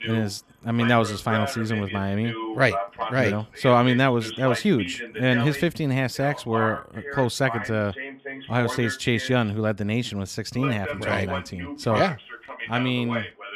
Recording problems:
voice in the background; loud; throughout; 8 dB below the speech

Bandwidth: 14.5 kHz